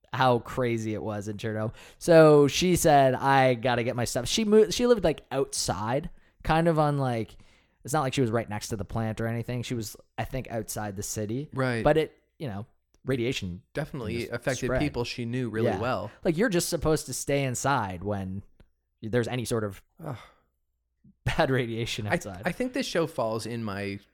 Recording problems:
uneven, jittery; strongly; from 1.5 to 20 s

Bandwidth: 17.5 kHz